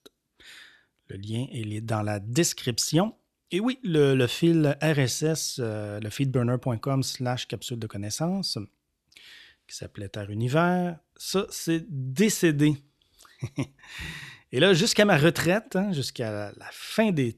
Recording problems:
none

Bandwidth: 13.5 kHz